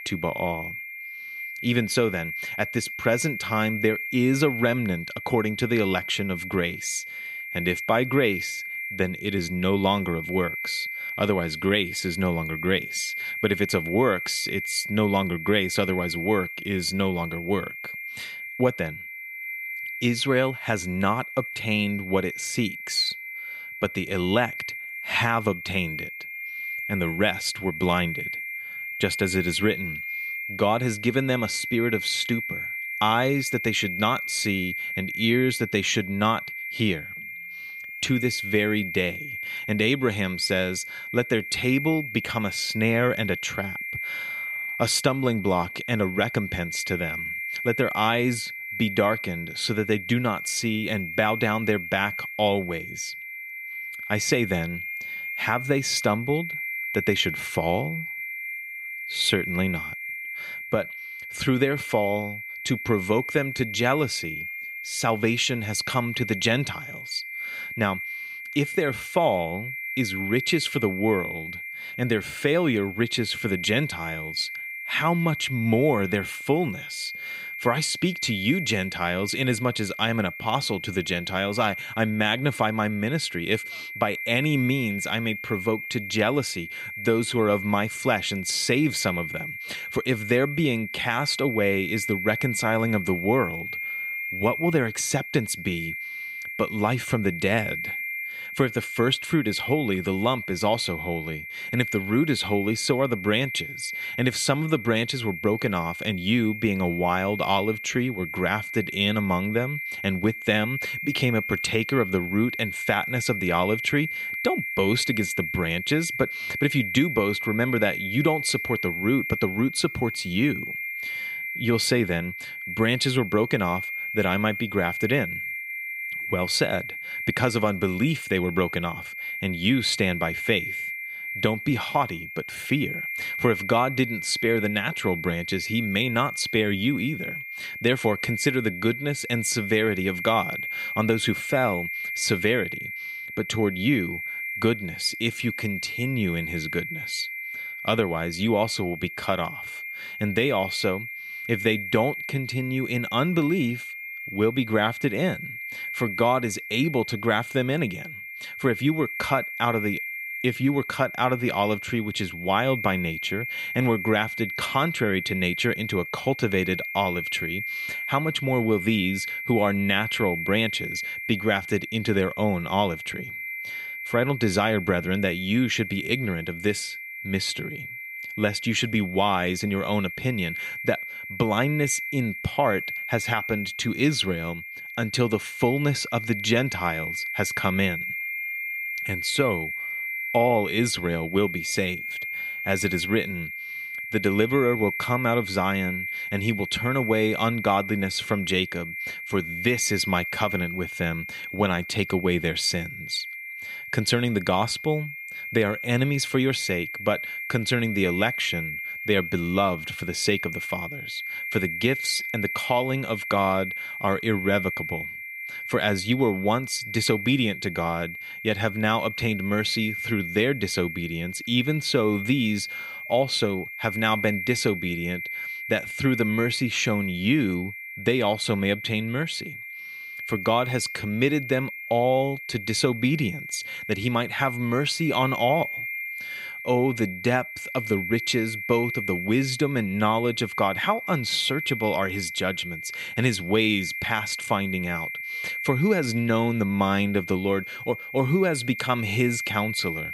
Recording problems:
high-pitched whine; loud; throughout; 2 kHz, 6 dB below the speech

